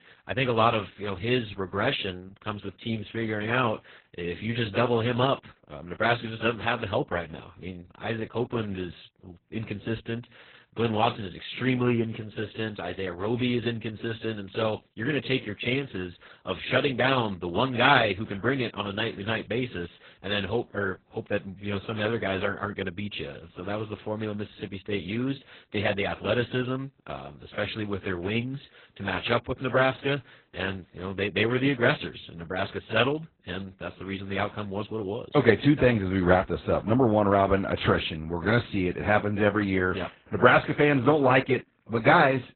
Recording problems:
garbled, watery; badly; nothing above 4 kHz

